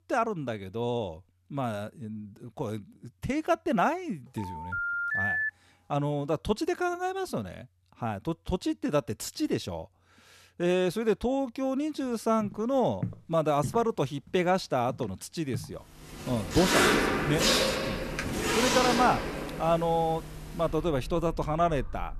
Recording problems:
household noises; very loud; from 16 s on; 1 dB above the speech
phone ringing; loud; from 4.5 to 5.5 s; peak 3 dB above the speech
footsteps; noticeable; from 12 to 16 s; peak 8 dB below the speech
keyboard typing; noticeable; at 18 s; peak 9 dB below the speech

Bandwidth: 13.5 kHz